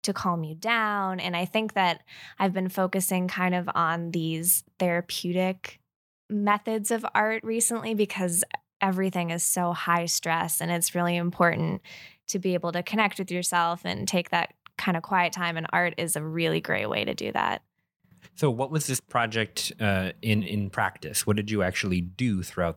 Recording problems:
none

